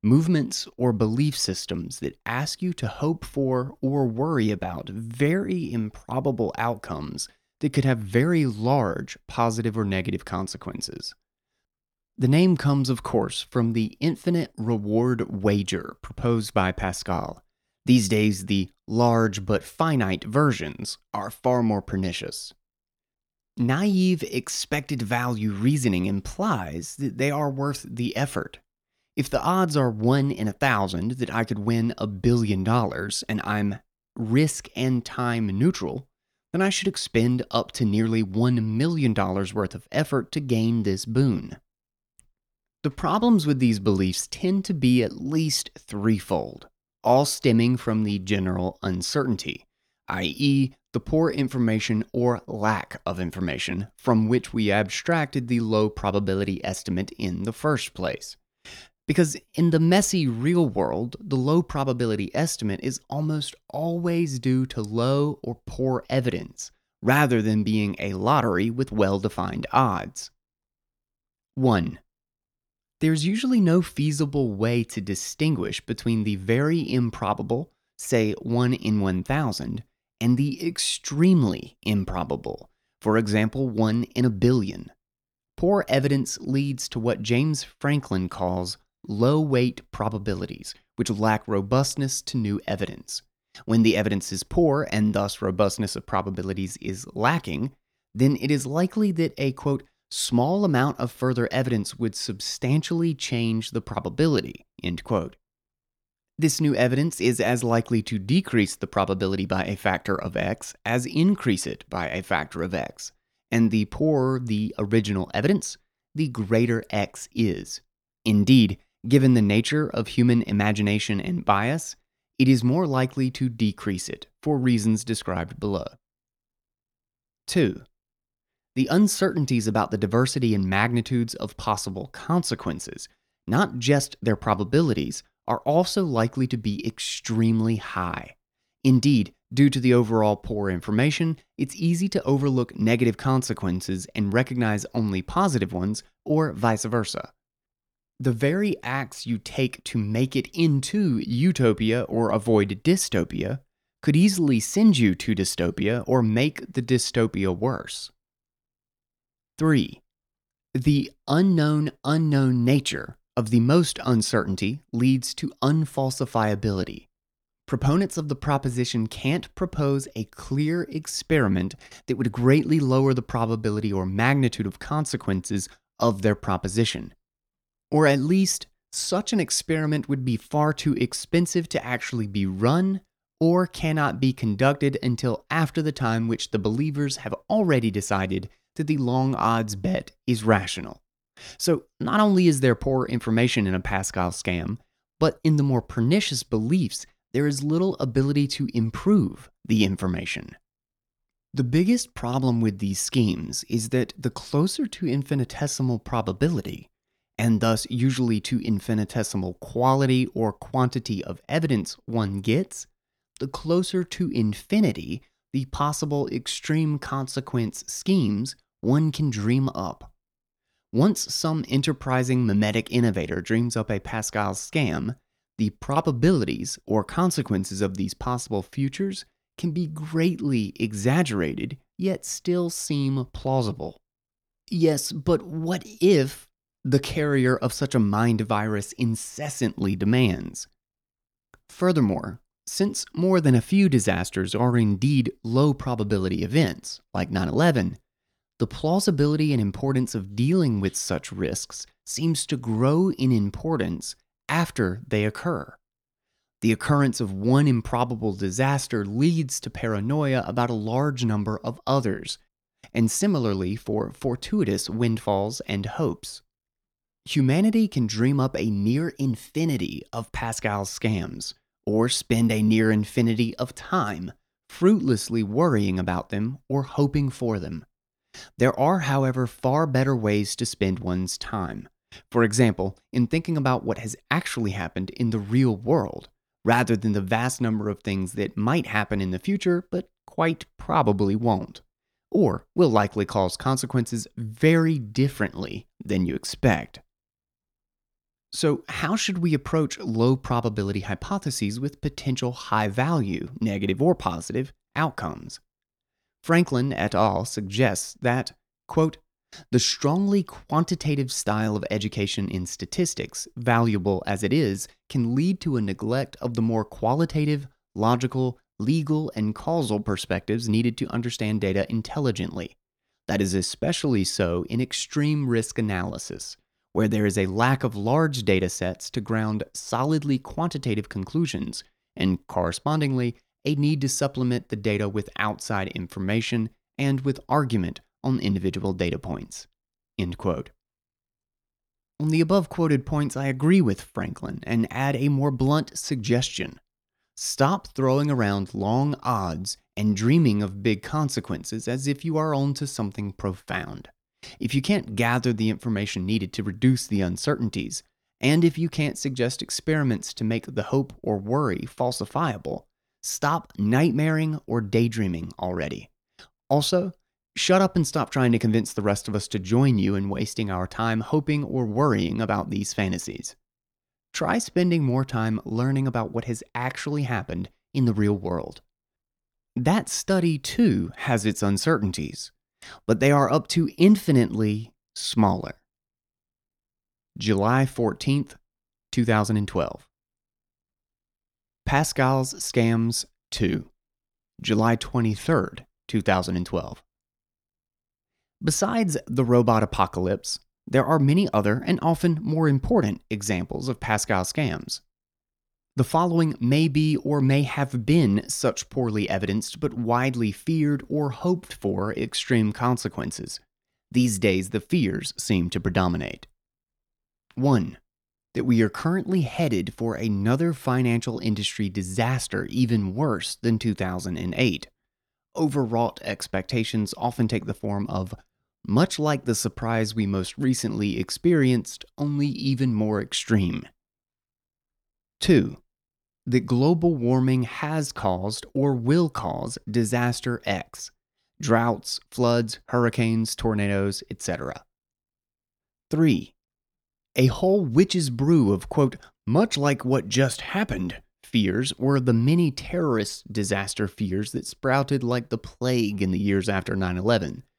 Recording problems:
none

